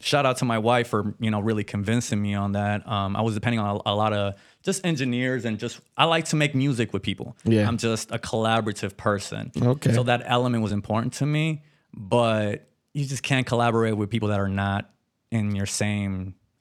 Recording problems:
uneven, jittery; strongly; from 1 to 16 s

